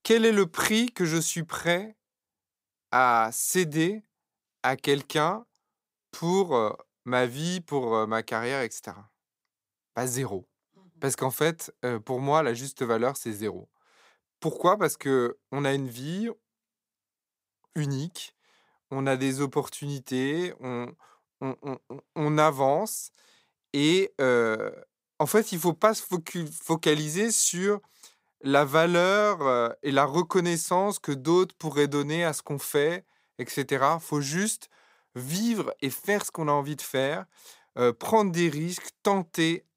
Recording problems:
none

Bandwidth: 15.5 kHz